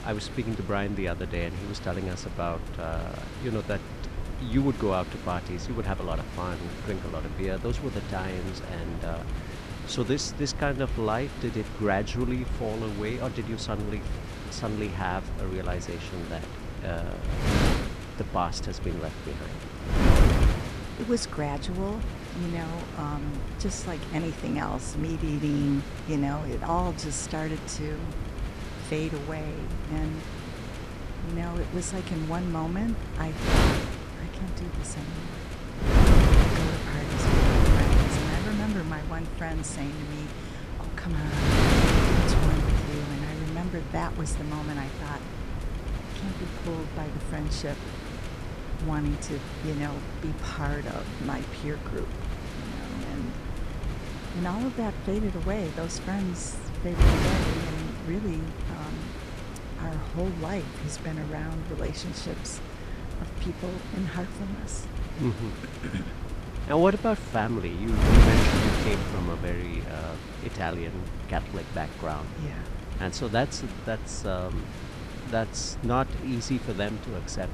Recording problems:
wind noise on the microphone; heavy; 1 dB below the speech

